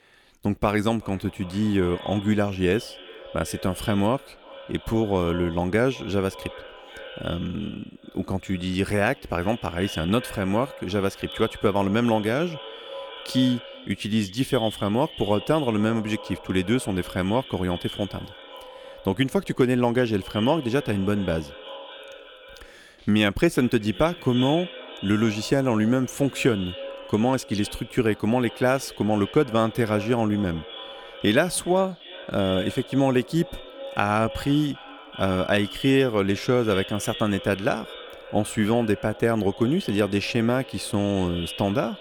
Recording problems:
echo of what is said; noticeable; throughout; 380 ms later, 15 dB below the speech

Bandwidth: 18.5 kHz